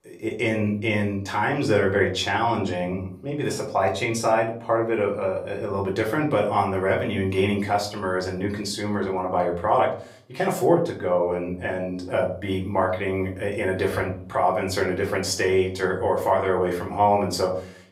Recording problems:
off-mic speech; far
room echo; slight; dies away in 0.4 s

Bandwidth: 15.5 kHz